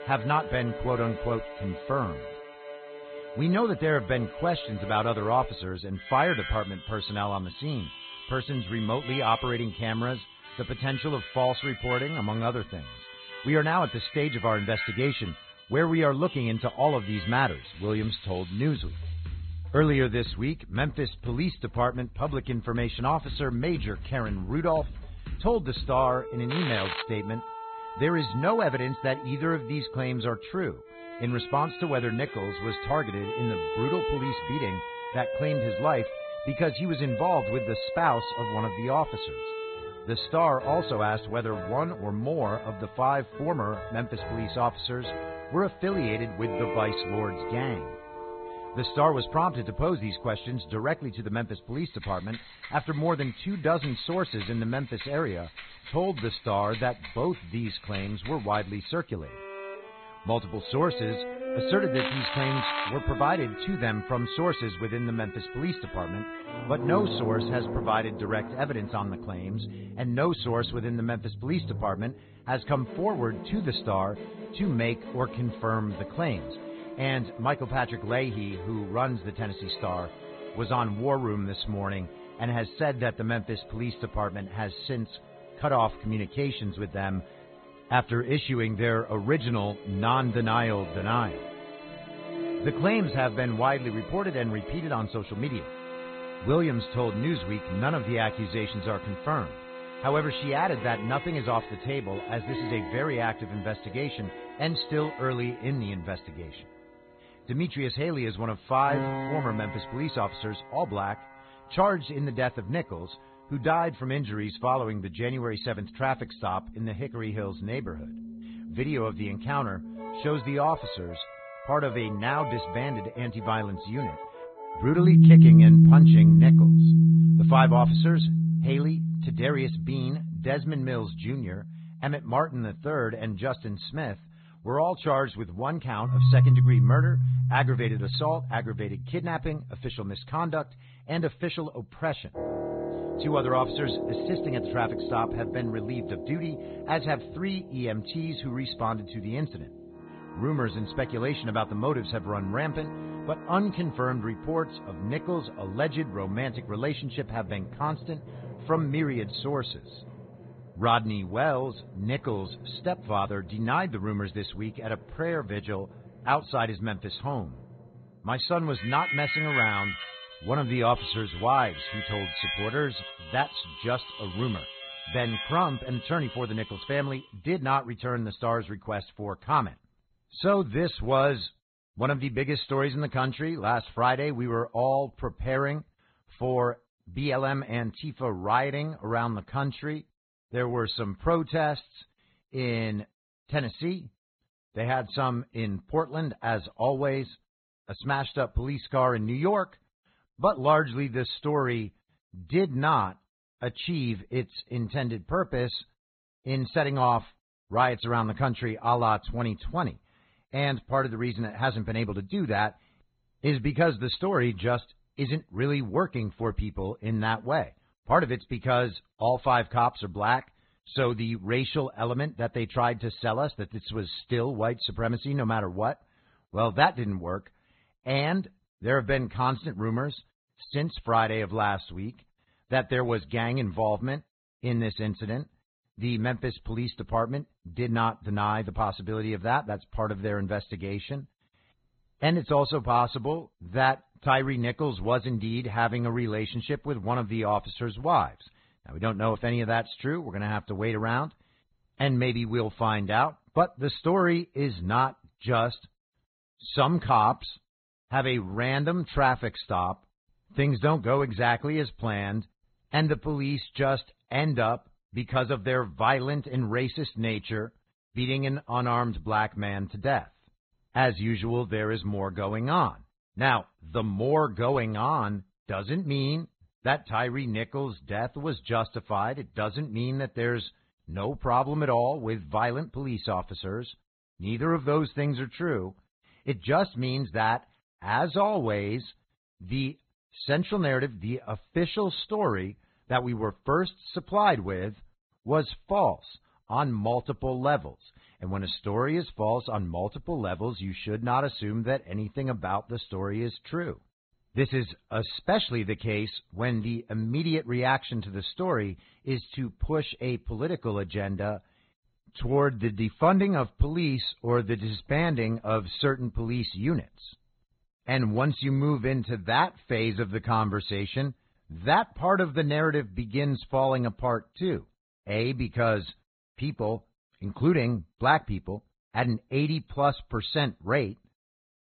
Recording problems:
garbled, watery; badly; nothing above 4 kHz
background music; very loud; until 2:57; 1 dB above the speech
crackling; loud; at 27 s and at 1:02; 4 dB below the speech

